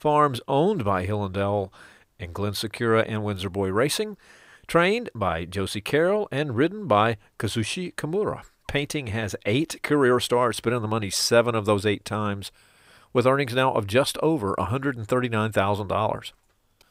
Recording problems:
none

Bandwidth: 15.5 kHz